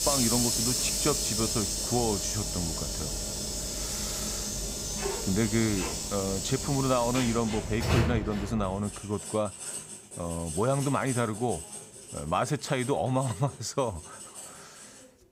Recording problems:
household noises; loud; throughout; 1 dB below the speech

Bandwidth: 15.5 kHz